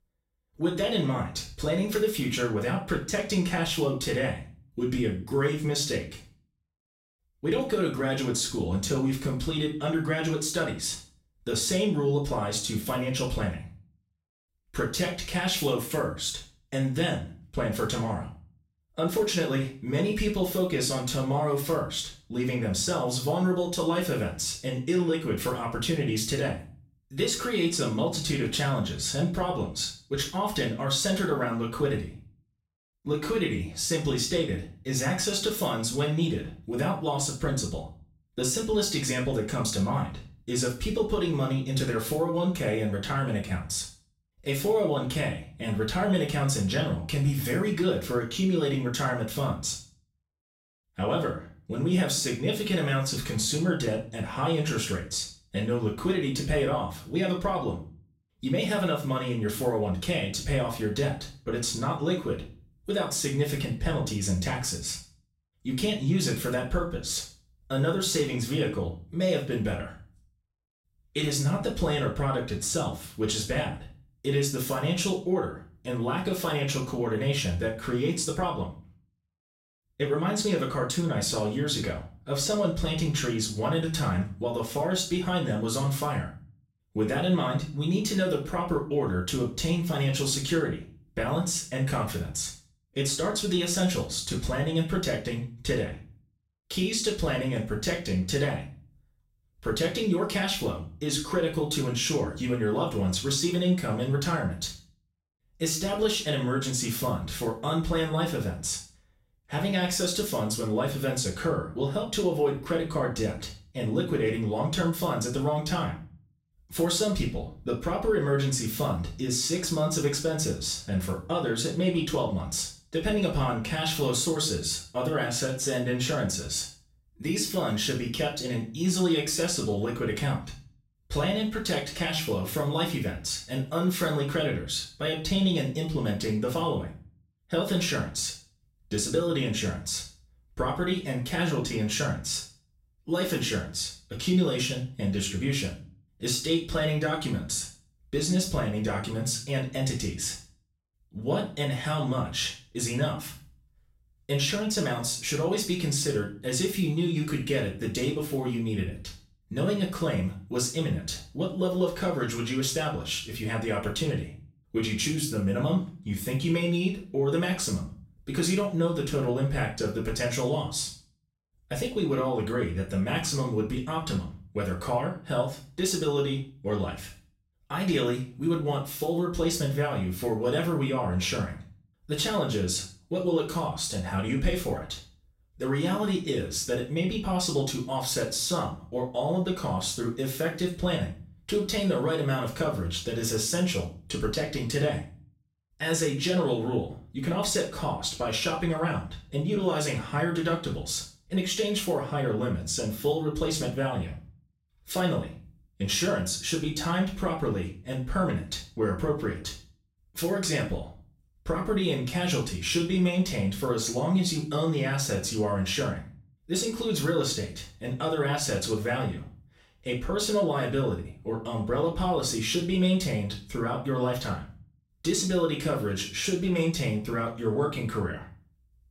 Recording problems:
off-mic speech; far
room echo; slight; dies away in 0.4 s

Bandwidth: 16 kHz